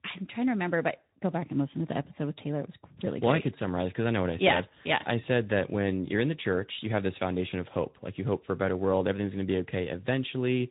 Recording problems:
high frequencies cut off; severe; nothing above 3.5 kHz
garbled, watery; slightly

